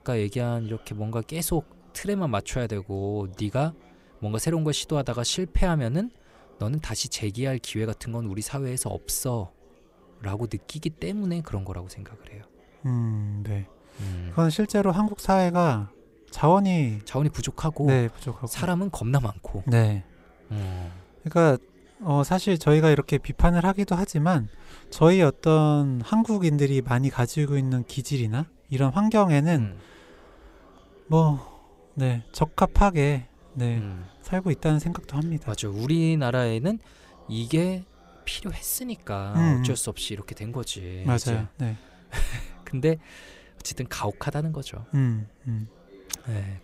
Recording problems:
chatter from many people; faint; throughout; 30 dB below the speech

